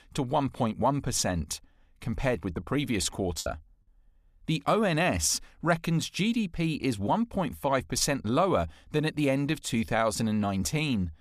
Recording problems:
choppy; occasionally; at 3.5 s; 2% of the speech affected

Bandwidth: 15 kHz